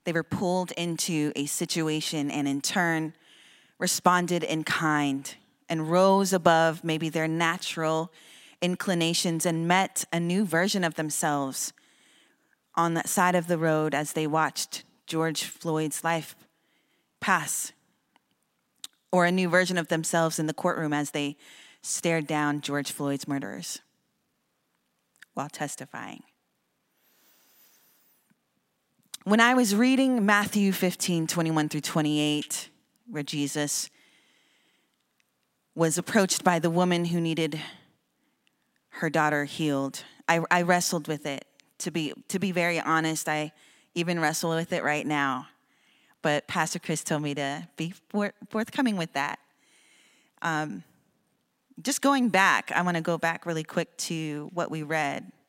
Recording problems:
none

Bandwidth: 16 kHz